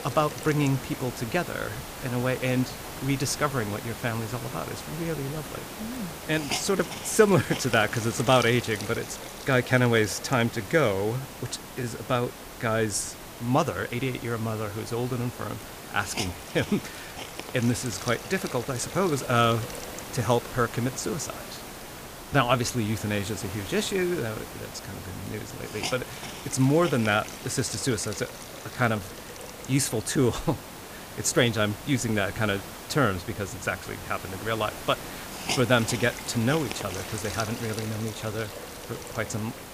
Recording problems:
hiss; loud; throughout; 10 dB below the speech

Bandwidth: 15 kHz